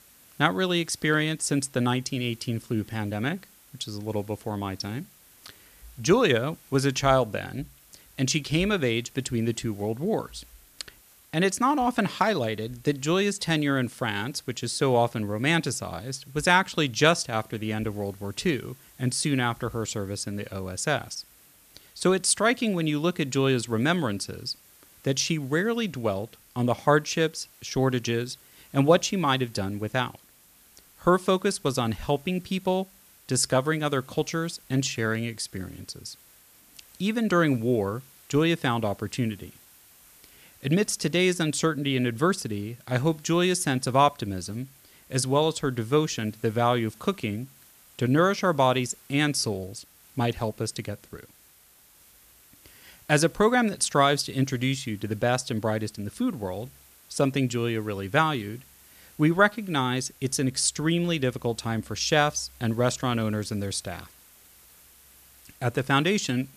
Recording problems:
hiss; faint; throughout; 25 dB below the speech

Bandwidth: 14.5 kHz